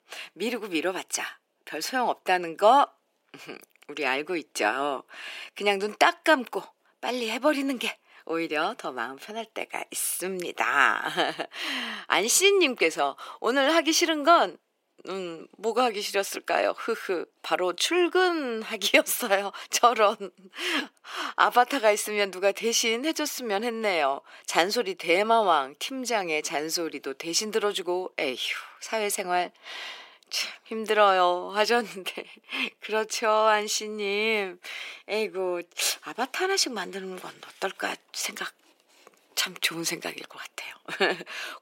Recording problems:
thin; very; fading below 350 Hz

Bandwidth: 16 kHz